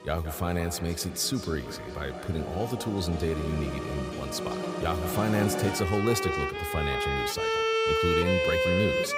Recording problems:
echo of what is said; noticeable; throughout; 170 ms later, 10 dB below the speech
background music; very loud; throughout; 1 dB above the speech

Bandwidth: 15.5 kHz